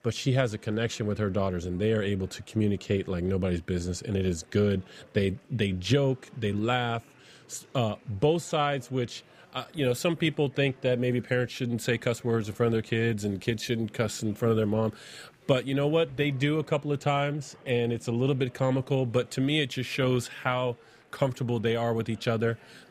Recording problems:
chatter from many people; faint; throughout; 30 dB below the speech

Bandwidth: 15 kHz